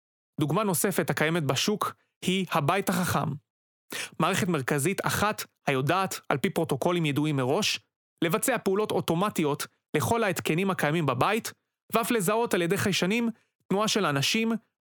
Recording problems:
squashed, flat; heavily

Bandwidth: 18.5 kHz